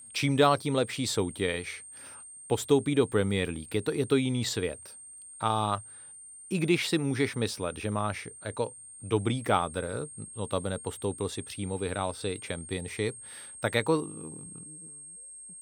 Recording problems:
high-pitched whine; noticeable; throughout; 8.5 kHz, 15 dB below the speech

